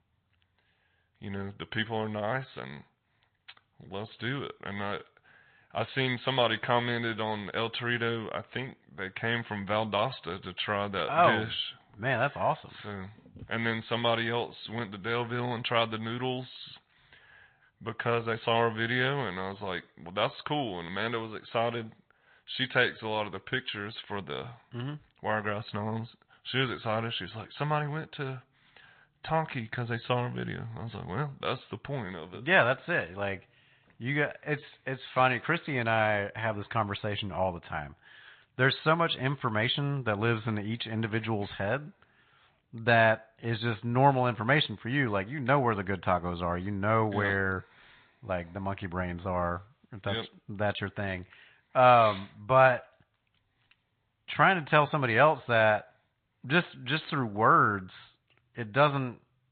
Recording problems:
high frequencies cut off; severe; nothing above 4 kHz
garbled, watery; slightly

